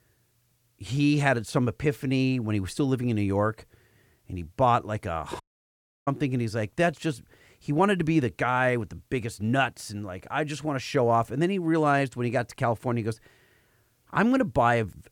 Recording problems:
audio cutting out; at 5.5 s for 0.5 s

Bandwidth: 18.5 kHz